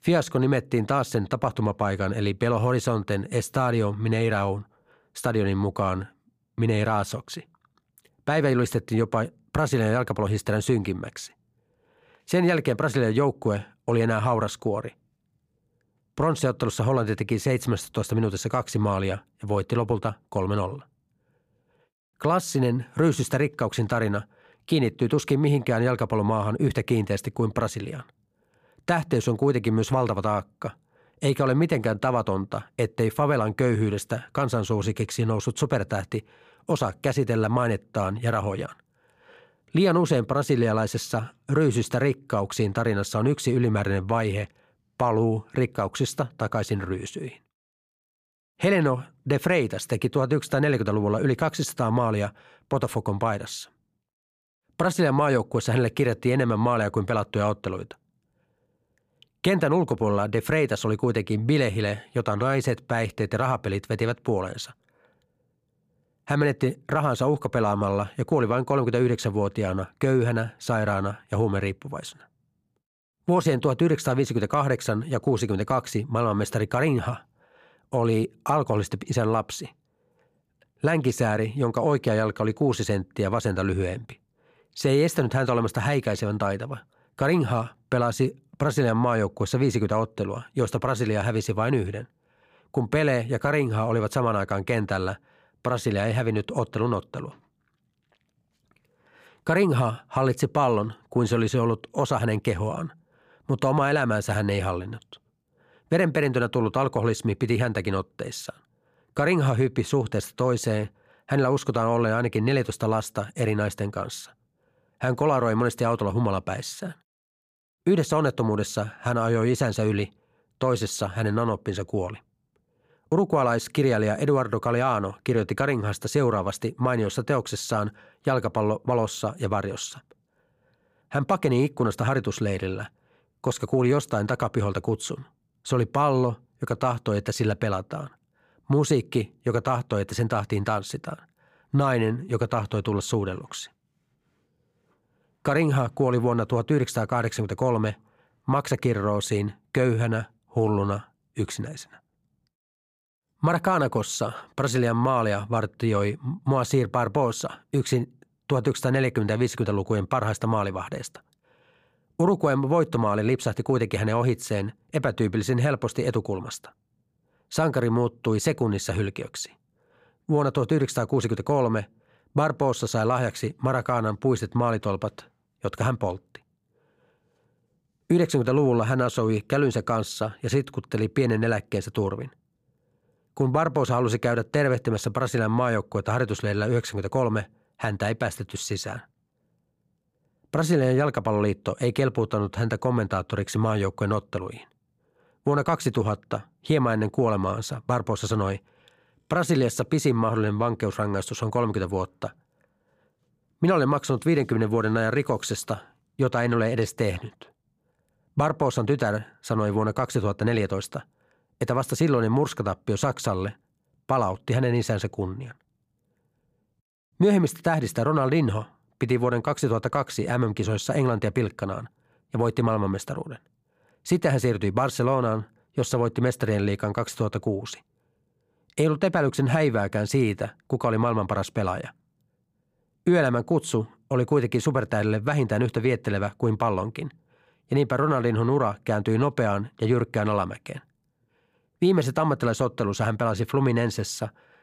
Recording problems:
none

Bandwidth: 15 kHz